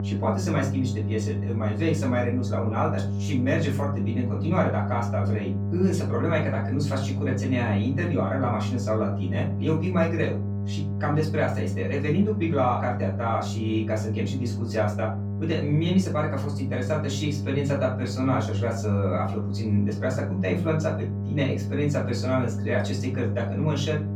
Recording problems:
off-mic speech; far
room echo; slight; dies away in 0.3 s
electrical hum; noticeable; throughout; 50 Hz, 10 dB below the speech

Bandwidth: 17.5 kHz